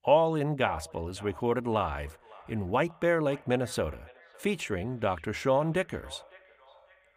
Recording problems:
echo of what is said; faint; throughout; 560 ms later, 25 dB below the speech

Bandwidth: 15 kHz